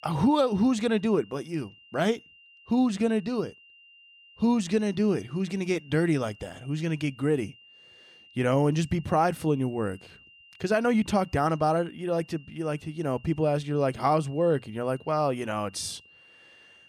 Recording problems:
high-pitched whine; faint; throughout; 3 kHz, 25 dB below the speech

